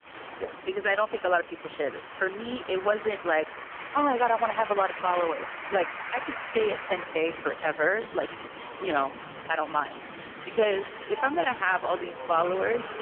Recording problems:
phone-call audio; poor line; nothing above 3 kHz
crowd noise; noticeable; throughout; 10 dB below the speech

